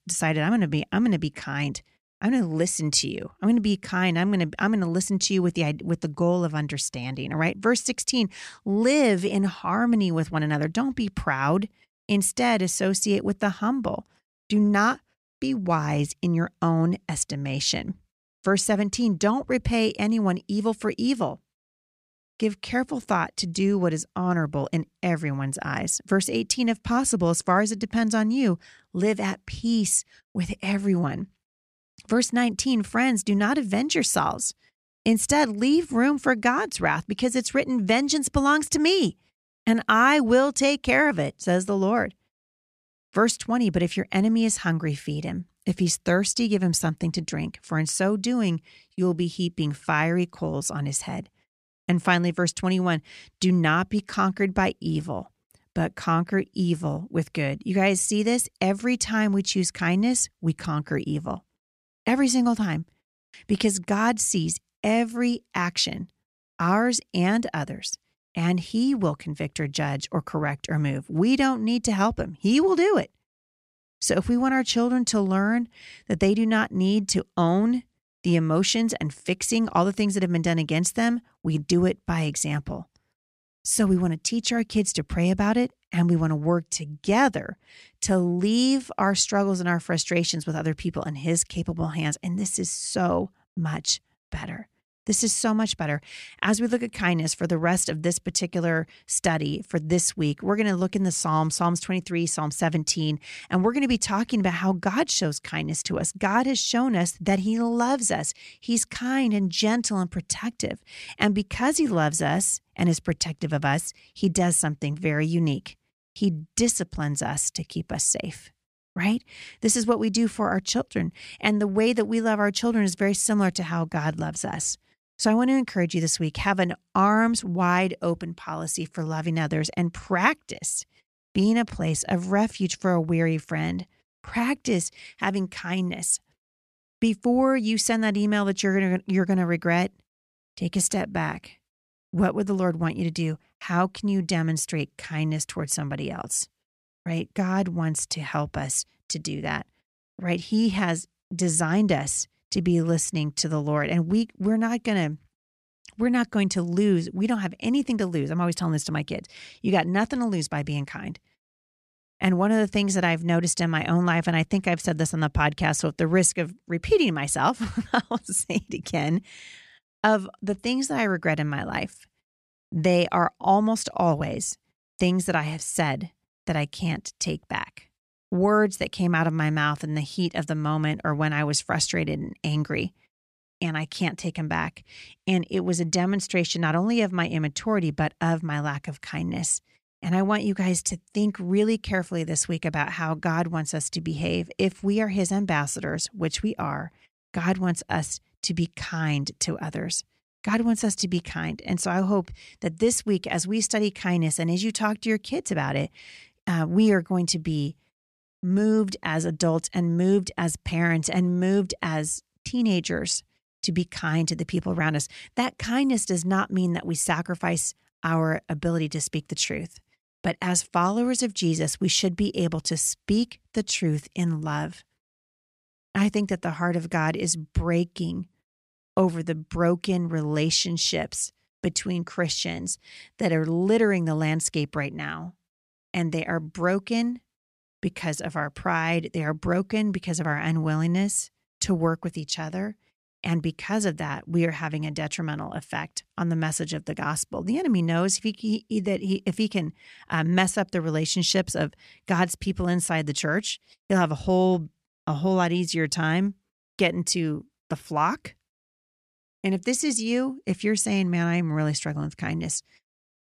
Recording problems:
none

